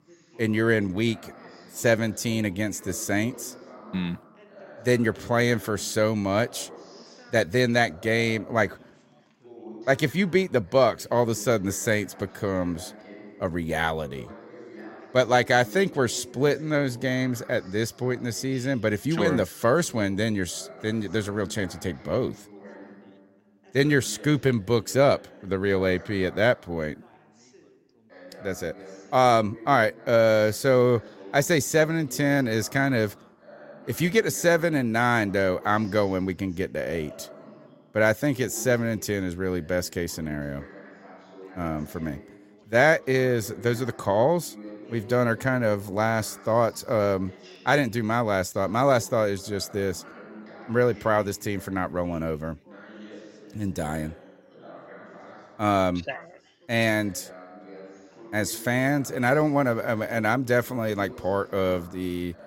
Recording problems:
background chatter; faint; throughout; 3 voices, 20 dB below the speech

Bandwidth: 16 kHz